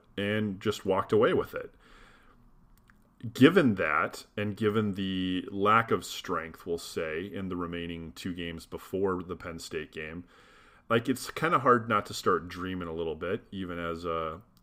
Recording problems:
none

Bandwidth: 15.5 kHz